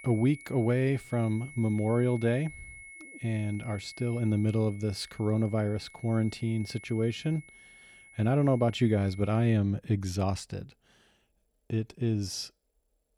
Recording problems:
high-pitched whine; noticeable; until 9.5 s; 2 kHz, 20 dB below the speech

